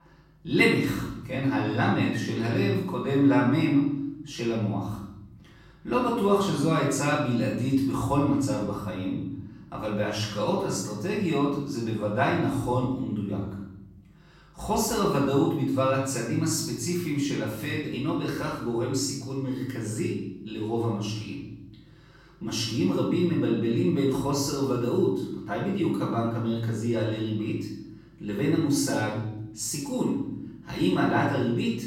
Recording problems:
off-mic speech; far
room echo; noticeable; dies away in 1 s

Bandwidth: 16 kHz